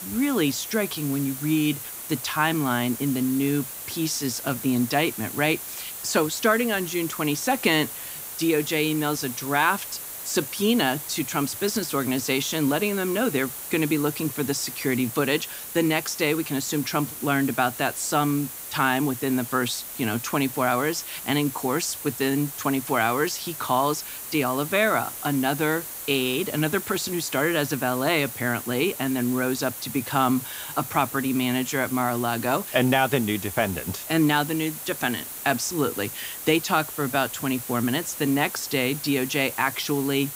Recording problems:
hiss; loud; throughout; 8 dB below the speech

